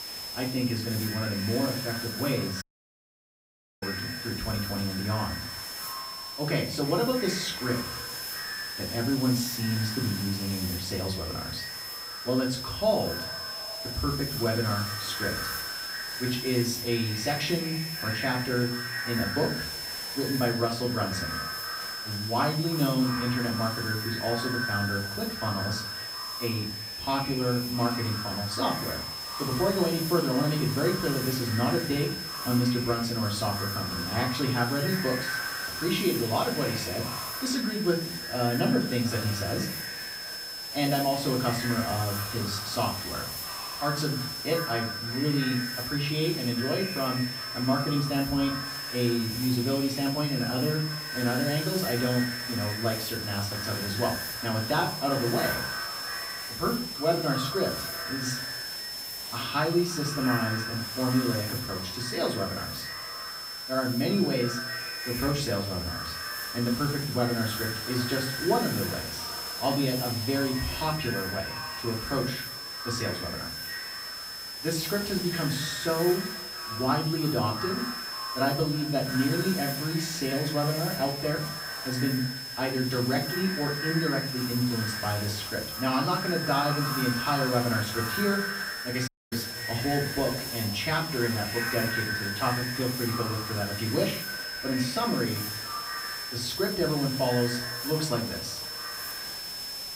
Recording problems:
echo of what is said; strong; throughout; 320 ms later, 9 dB below the speech
off-mic speech; far
room echo; slight; dies away in 0.4 s
high-pitched whine; loud; throughout; 5 kHz, 6 dB below the speech
hiss; loud; throughout; 10 dB below the speech
audio cutting out; at 2.5 s for 1 s and at 1:29

